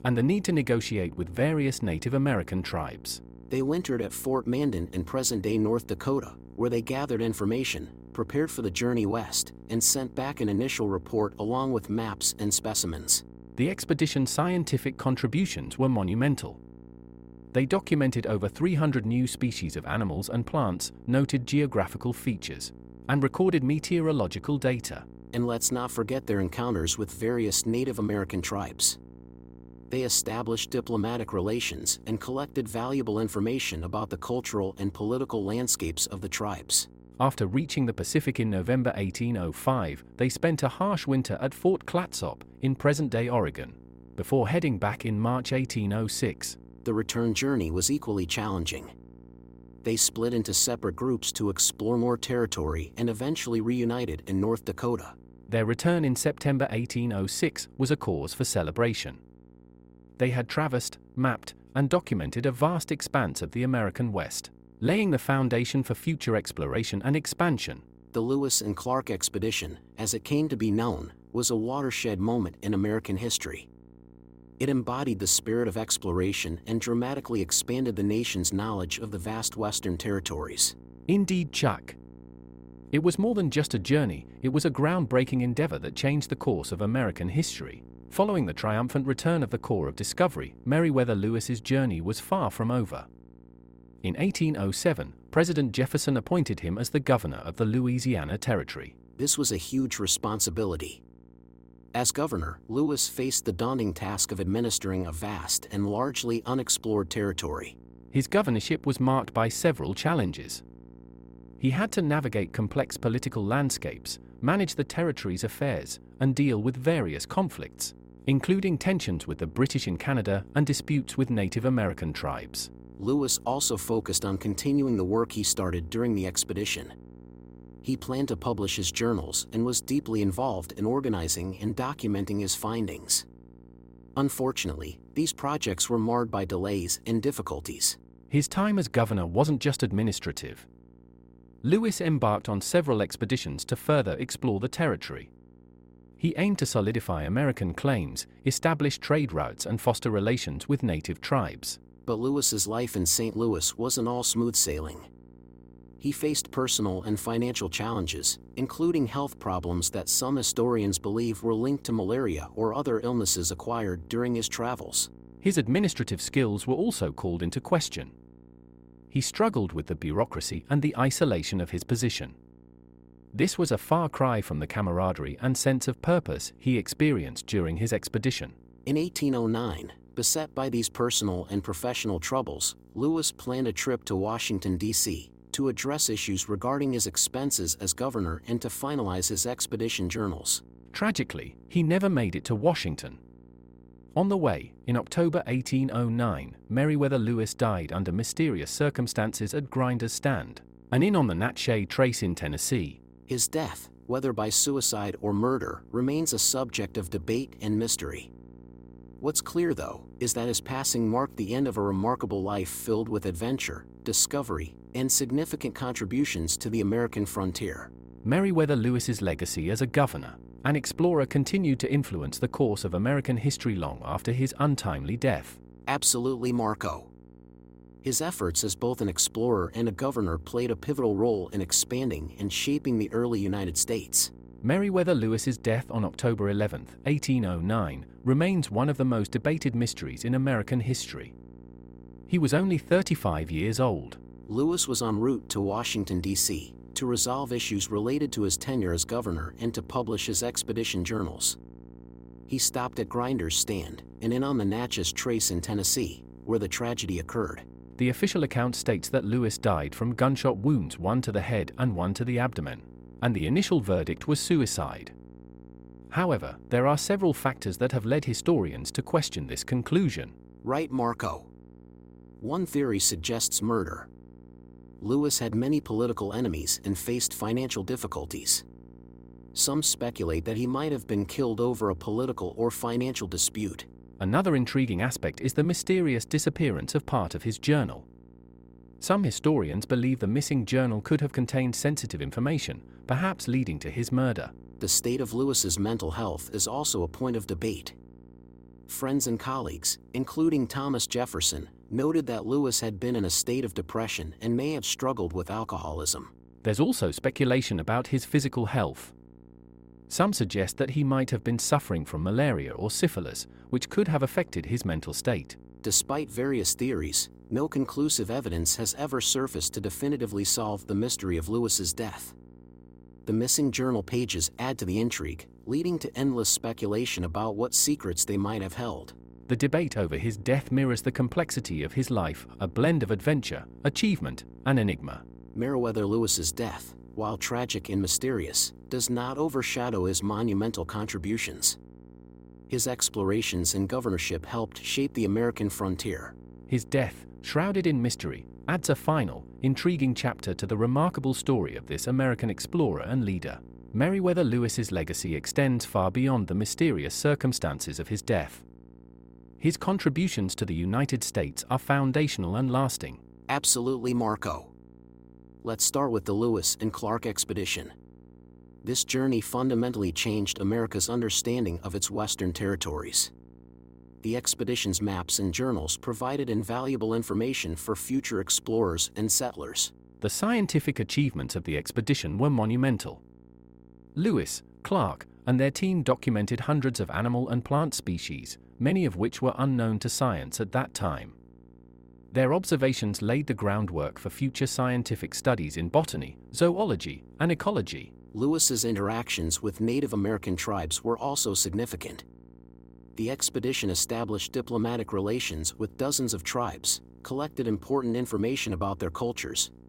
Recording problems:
electrical hum; faint; throughout; 60 Hz, 25 dB below the speech

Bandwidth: 16 kHz